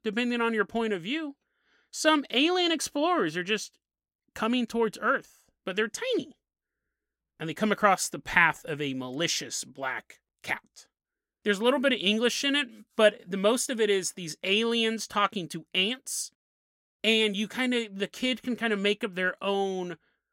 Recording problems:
none

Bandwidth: 16 kHz